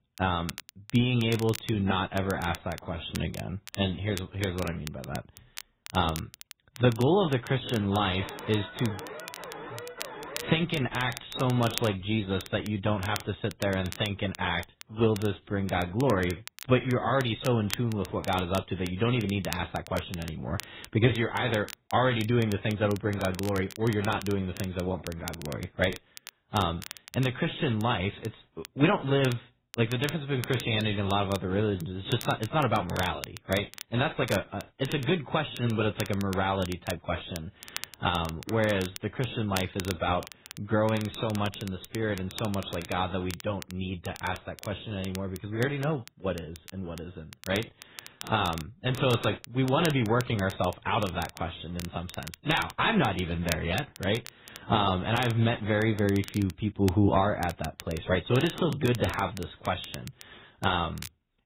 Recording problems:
garbled, watery; badly; nothing above 4 kHz
crackle, like an old record; noticeable; 15 dB below the speech
alarm; faint; from 8 to 11 s; peak 10 dB below the speech

